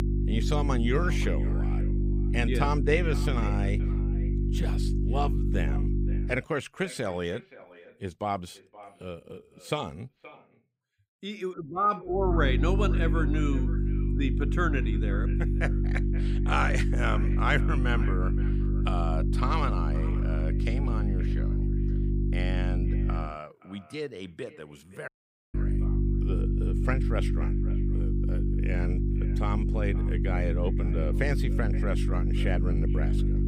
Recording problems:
echo of what is said; noticeable; throughout; 520 ms later, 15 dB below the speech
electrical hum; loud; until 6.5 s, from 12 to 23 s and from 26 s on; 50 Hz, 6 dB below the speech
audio cutting out; at 25 s

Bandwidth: 15.5 kHz